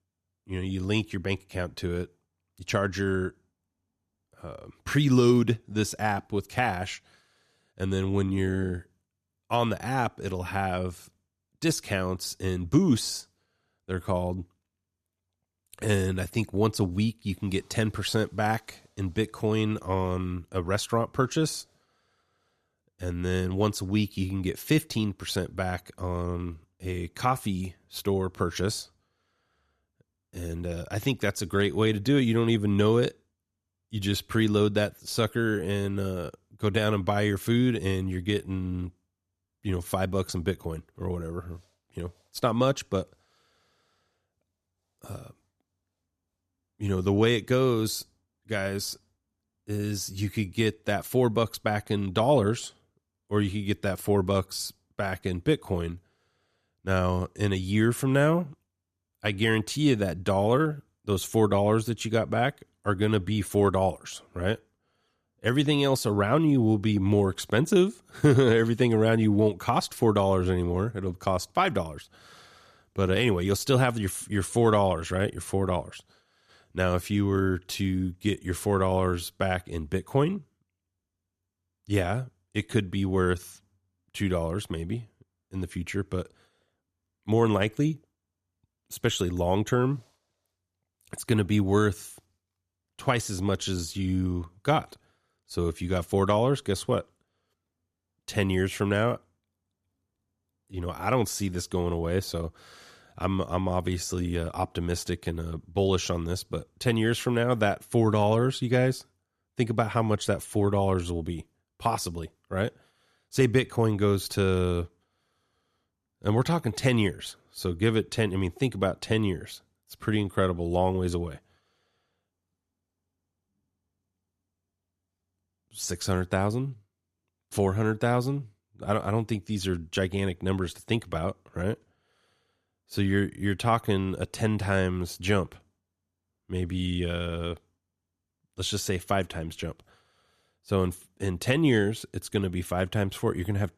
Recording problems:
none

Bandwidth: 14.5 kHz